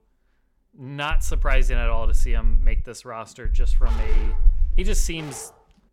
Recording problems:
low rumble; faint; from 1 to 3 s and from 3.5 to 5 s; 20 dB below the speech
dog barking; noticeable; from 4 s on; peak 7 dB below the speech

